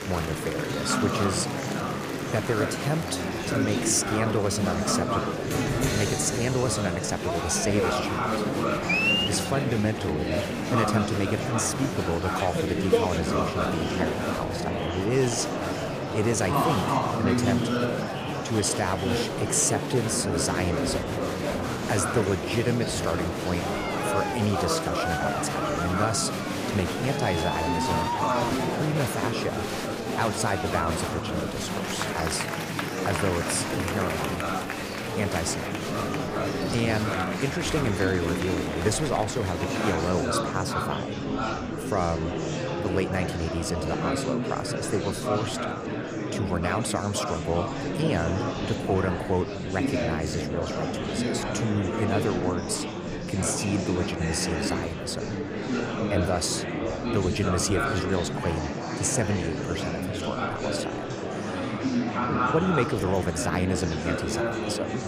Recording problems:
murmuring crowd; very loud; throughout; 1 dB above the speech

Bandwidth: 15 kHz